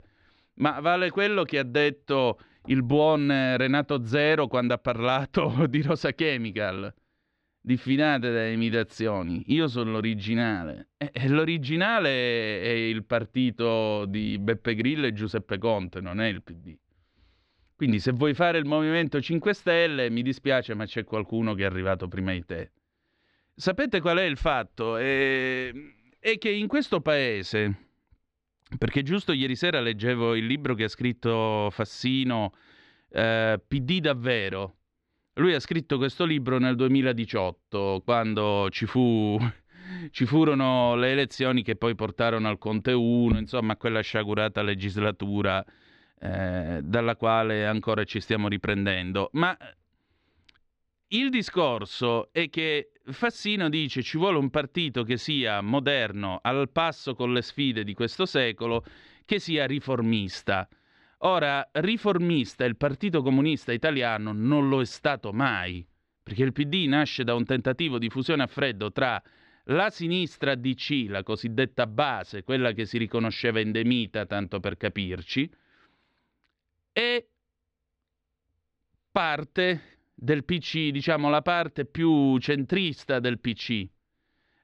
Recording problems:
muffled; slightly; fading above 3 kHz

